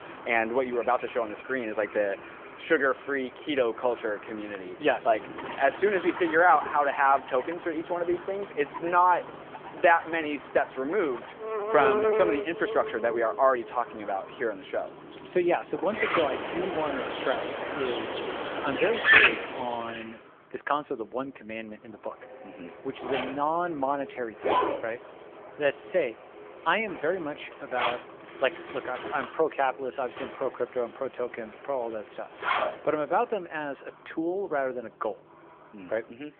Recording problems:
phone-call audio; nothing above 3.5 kHz
animal sounds; loud; until 20 s; 1 dB below the speech
household noises; noticeable; throughout; 10 dB below the speech

